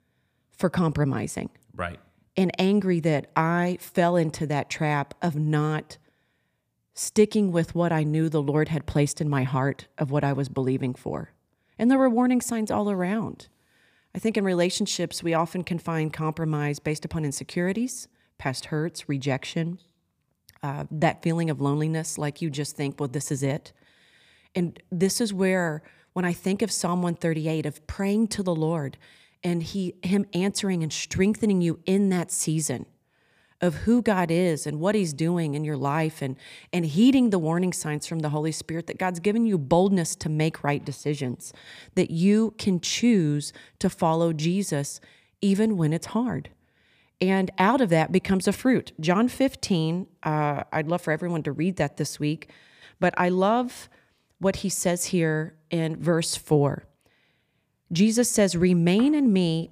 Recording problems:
none

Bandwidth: 15 kHz